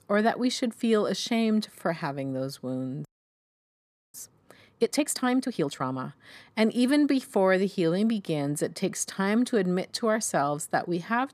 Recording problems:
audio freezing; at 3 s for 1 s

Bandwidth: 14.5 kHz